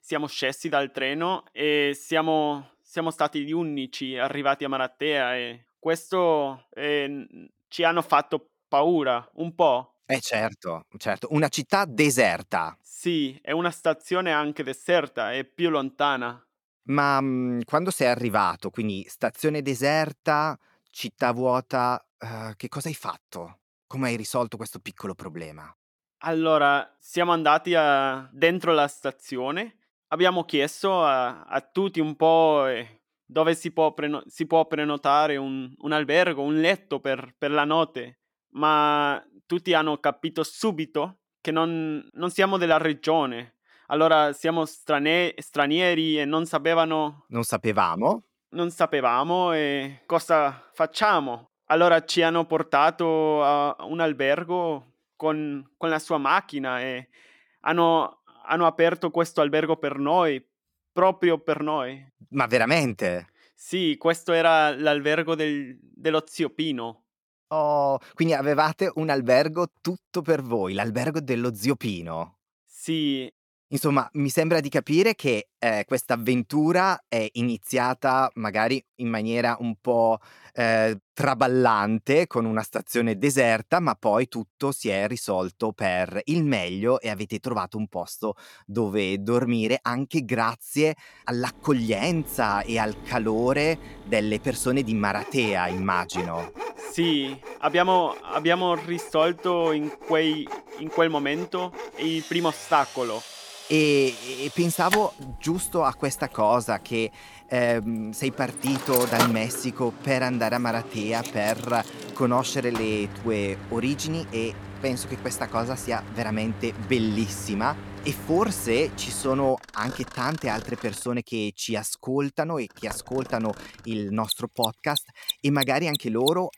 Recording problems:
machinery noise; noticeable; from 1:32 on; 10 dB below the speech

